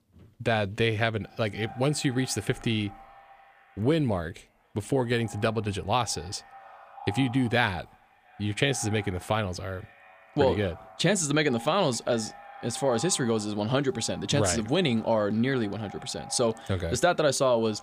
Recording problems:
echo of what is said; faint; throughout; 340 ms later, 20 dB below the speech

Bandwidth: 15 kHz